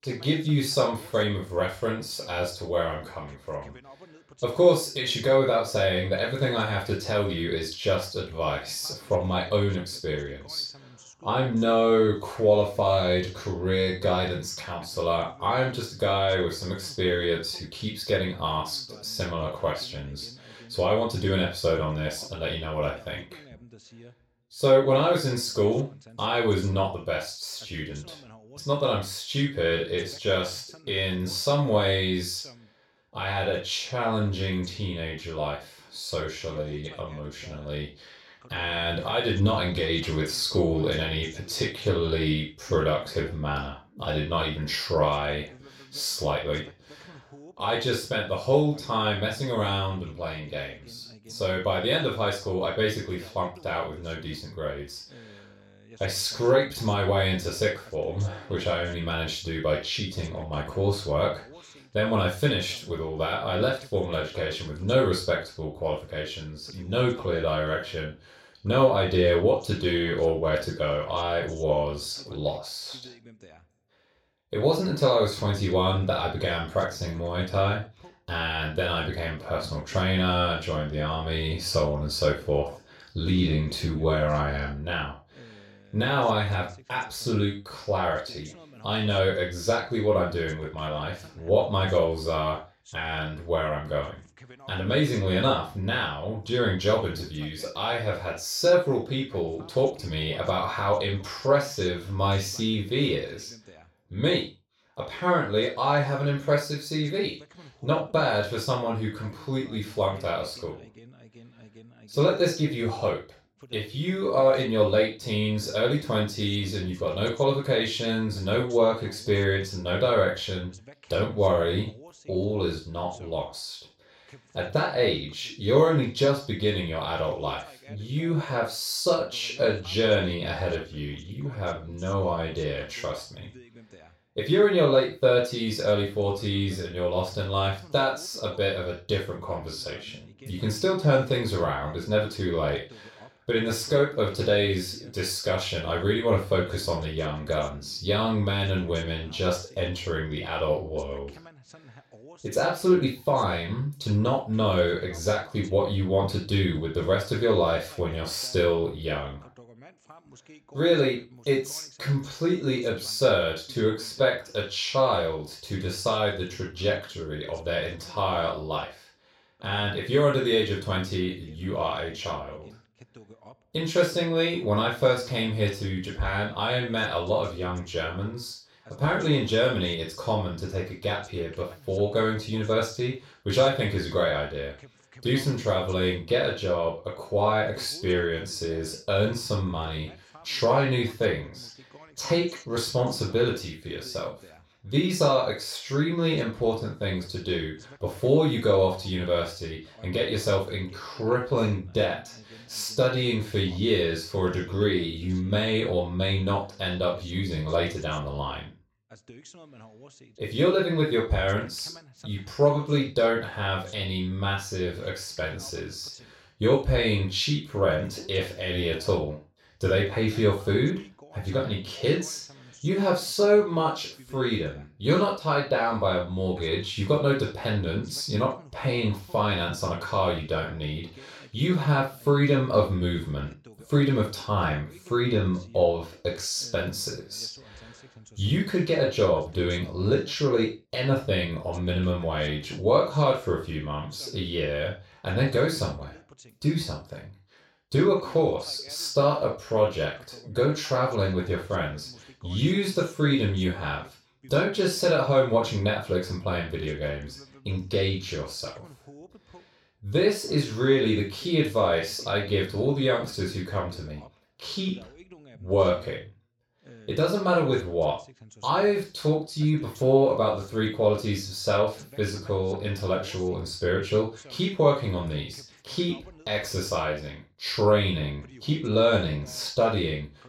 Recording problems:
off-mic speech; far
room echo; noticeable; dies away in 0.3 s
voice in the background; faint; throughout; 25 dB below the speech

